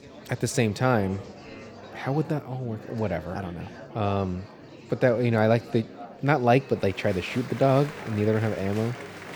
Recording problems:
murmuring crowd; noticeable; throughout; 15 dB below the speech

